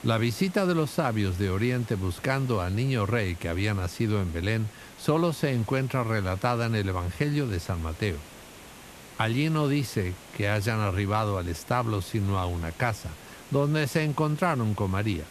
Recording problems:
hiss; noticeable; throughout; 20 dB below the speech

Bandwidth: 14 kHz